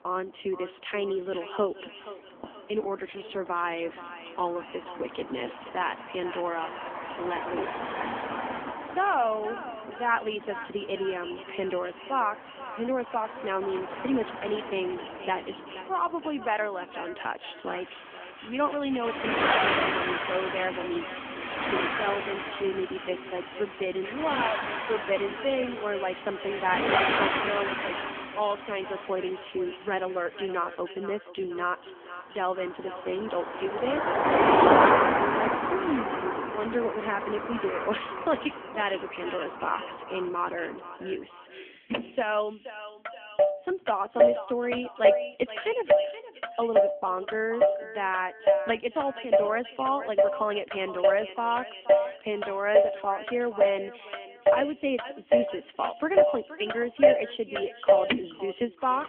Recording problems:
phone-call audio; poor line; nothing above 3.5 kHz
echo of what is said; noticeable; throughout; 480 ms later, 15 dB below the speech
traffic noise; very loud; throughout; 4 dB above the speech

